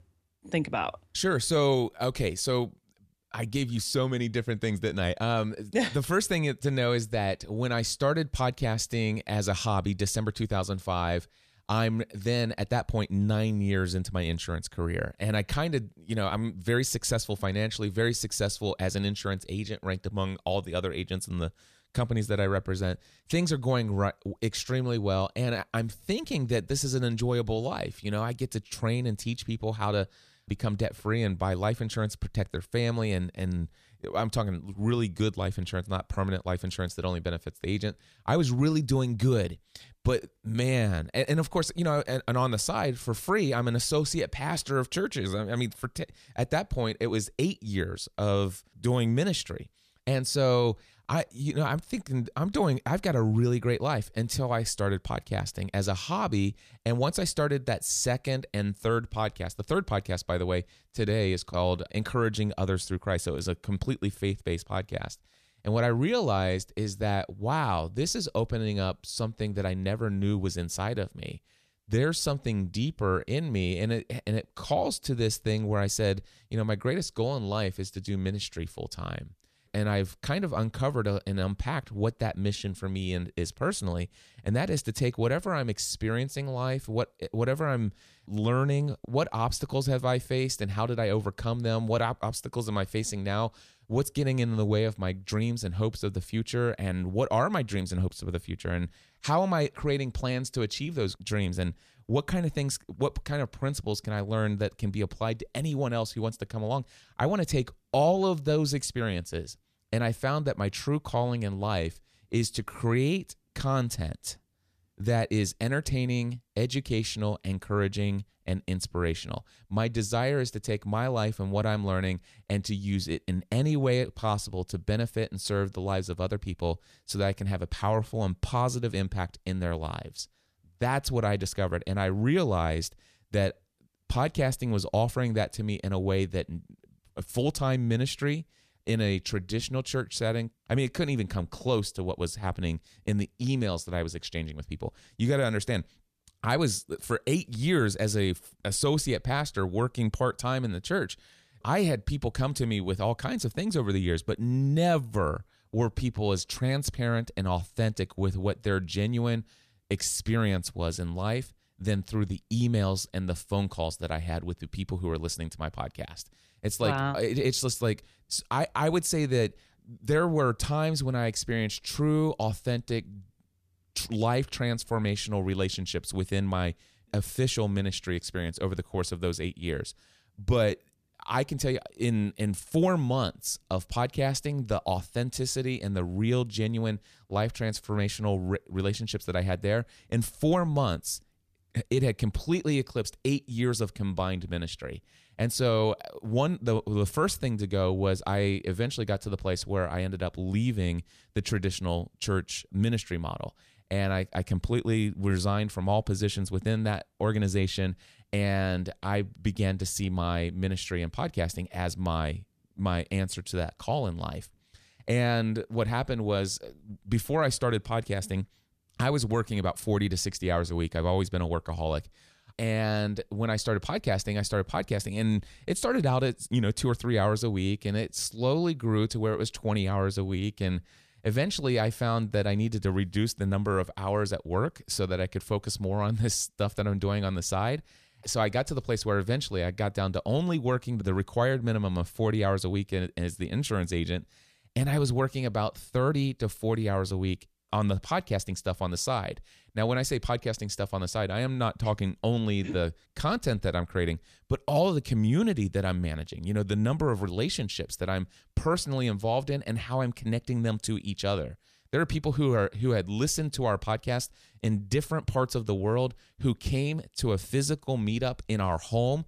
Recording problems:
none

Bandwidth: 14.5 kHz